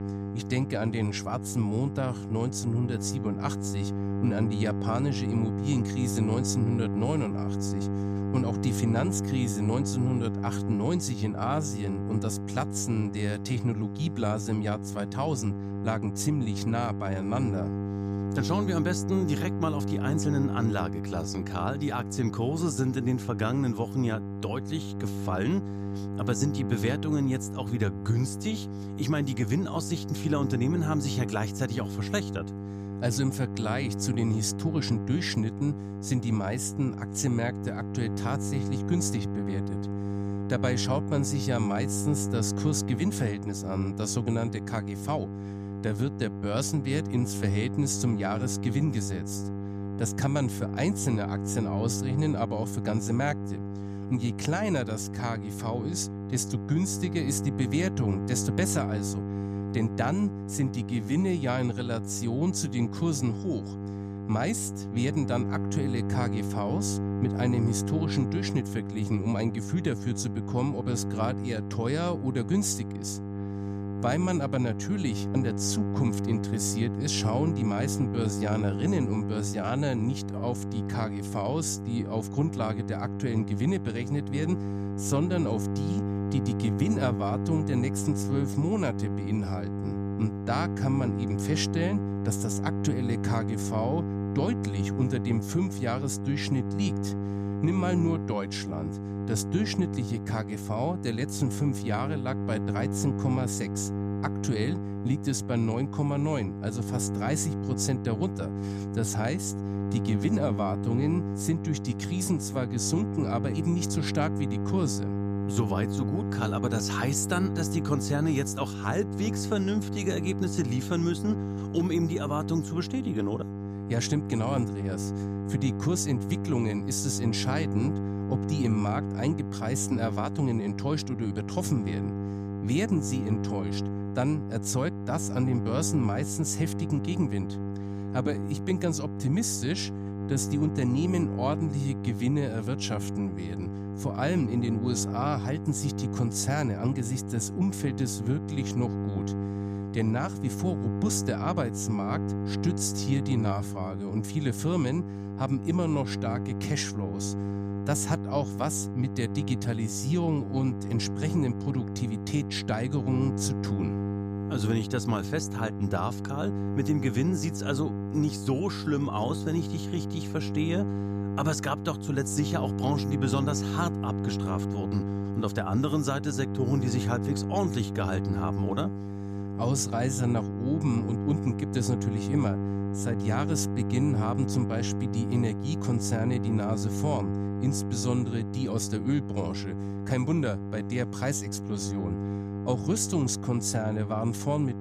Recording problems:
electrical hum; loud; throughout; 50 Hz, 6 dB below the speech

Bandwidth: 15 kHz